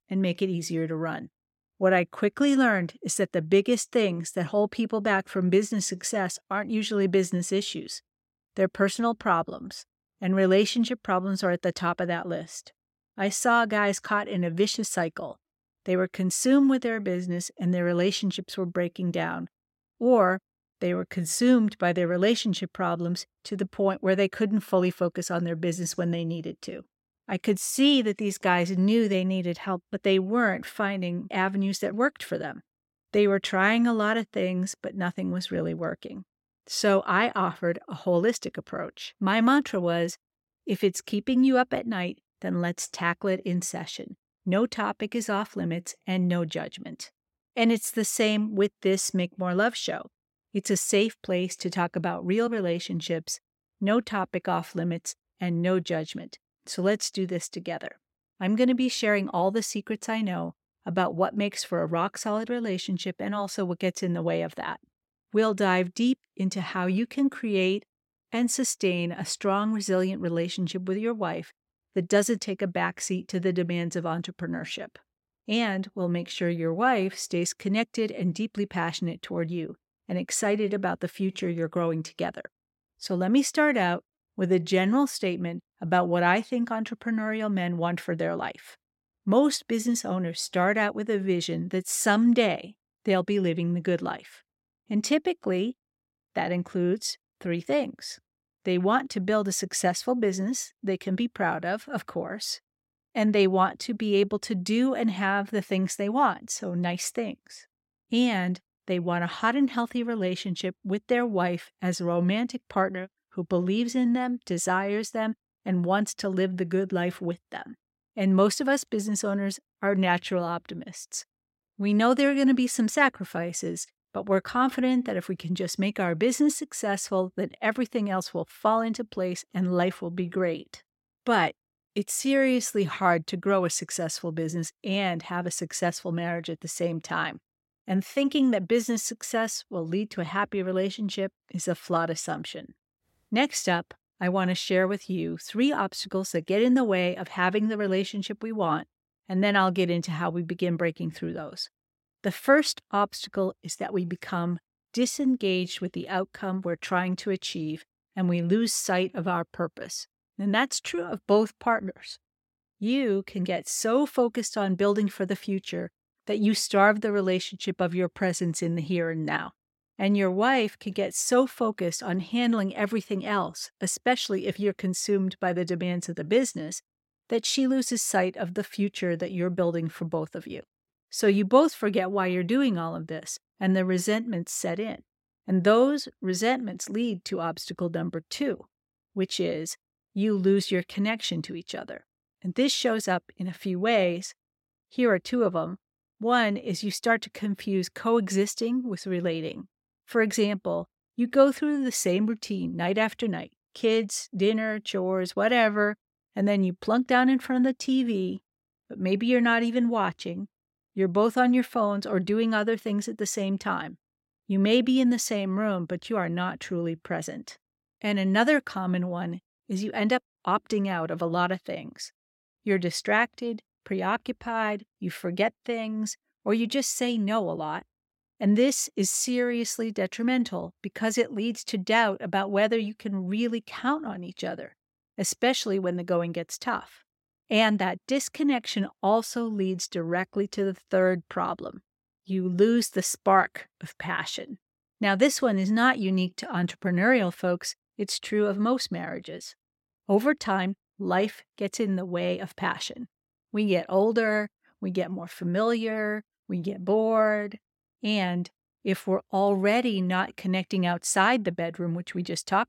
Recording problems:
none

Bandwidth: 16.5 kHz